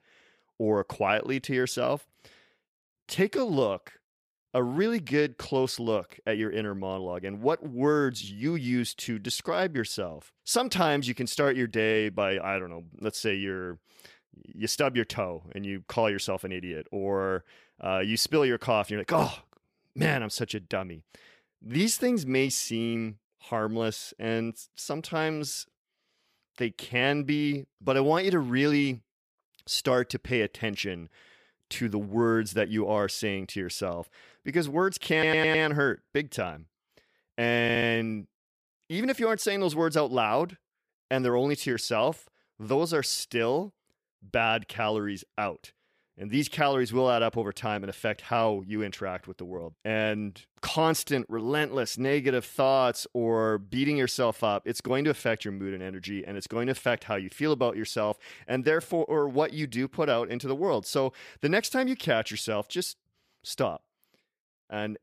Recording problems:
audio stuttering; at 35 s and at 38 s

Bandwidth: 15 kHz